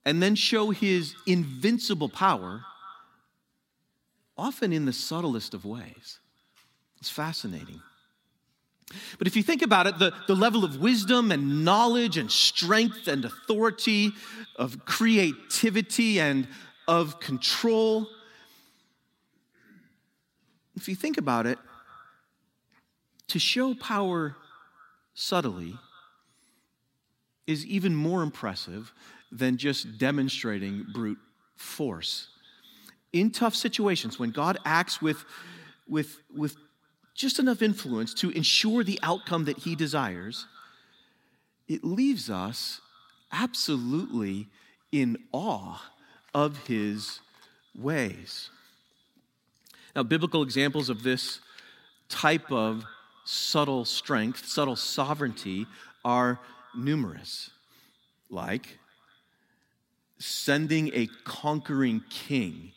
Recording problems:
echo of what is said; faint; throughout; 200 ms later, 25 dB below the speech

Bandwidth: 16 kHz